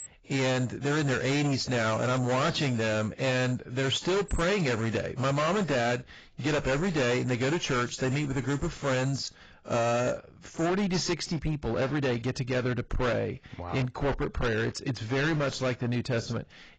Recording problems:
distortion; heavy; 22% of the sound clipped
garbled, watery; badly; nothing above 7.5 kHz
high-pitched whine; faint; until 11 s; 7.5 kHz, 25 dB below the speech

